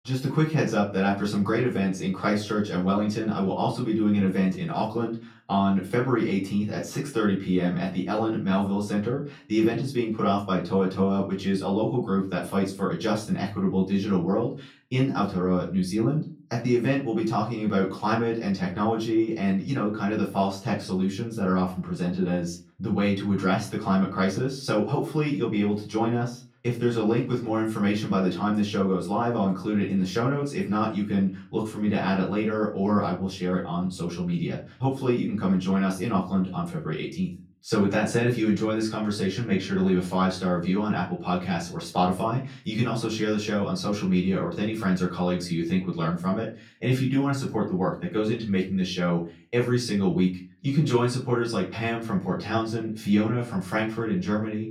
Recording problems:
off-mic speech; far
room echo; slight; dies away in 0.3 s

